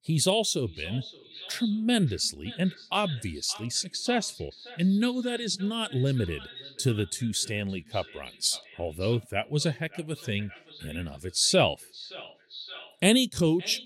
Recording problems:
echo of what is said; noticeable; throughout; 570 ms later, 15 dB below the speech

